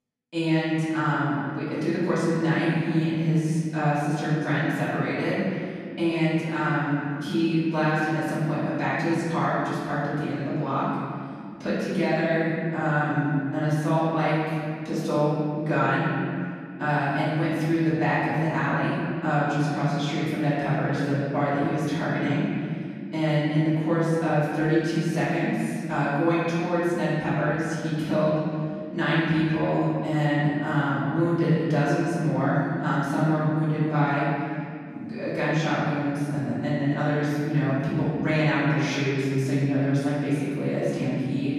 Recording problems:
room echo; strong; dies away in 2.3 s
off-mic speech; far

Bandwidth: 13.5 kHz